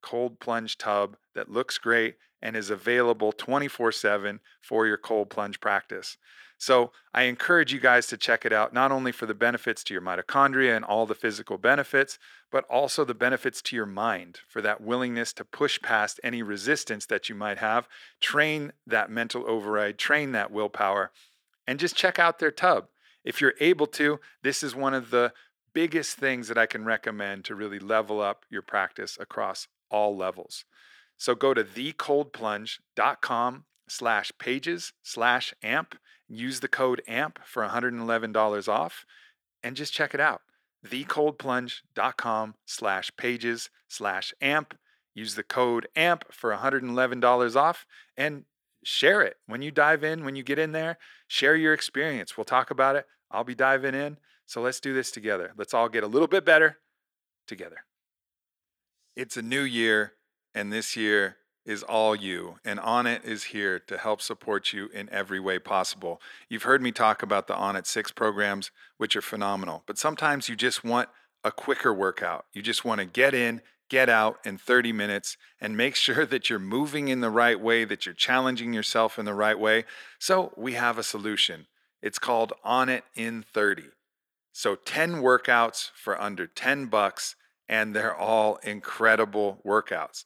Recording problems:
thin; somewhat; fading below 350 Hz

